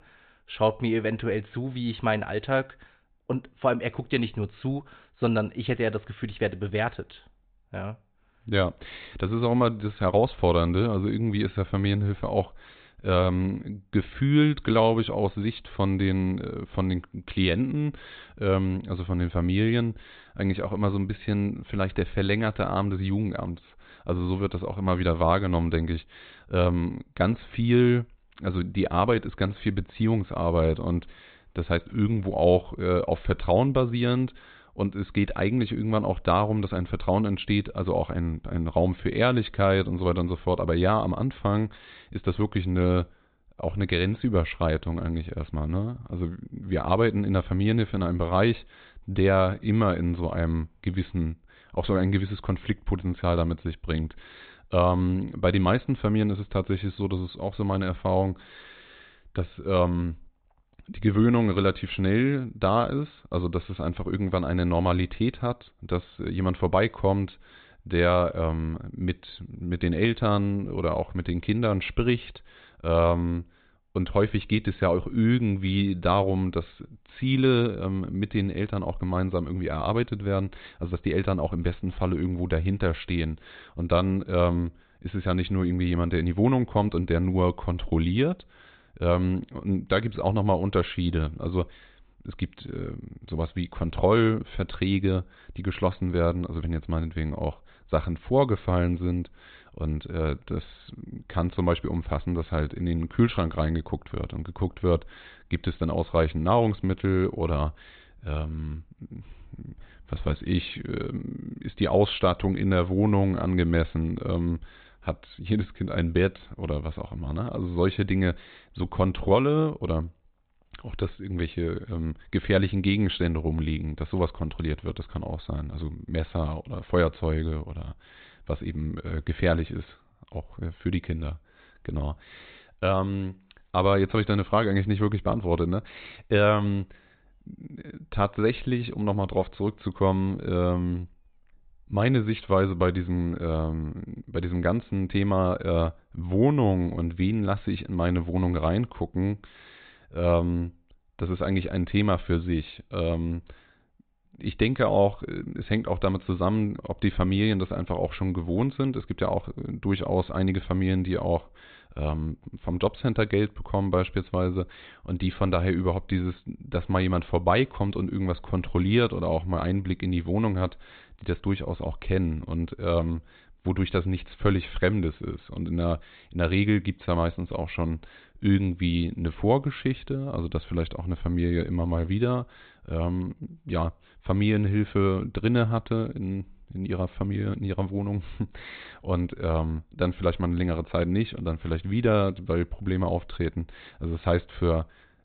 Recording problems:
high frequencies cut off; severe; nothing above 4 kHz

